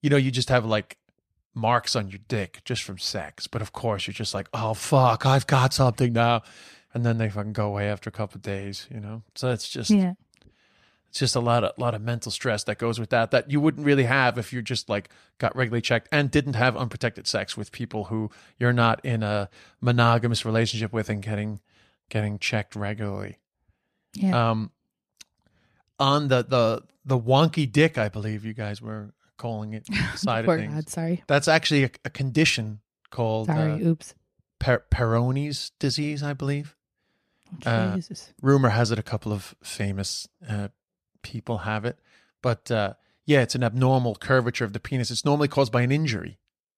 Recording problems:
none

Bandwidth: 14.5 kHz